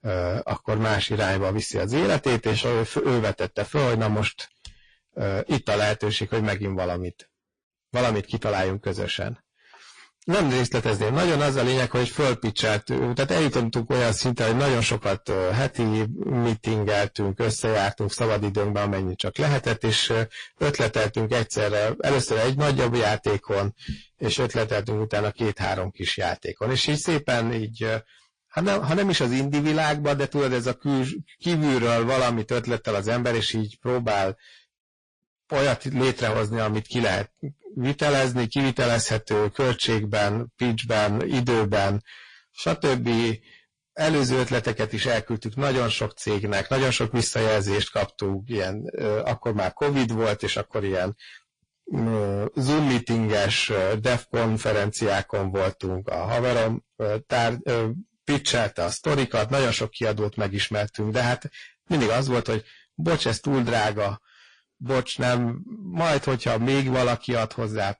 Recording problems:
distortion; heavy; 17% of the sound clipped
garbled, watery; slightly

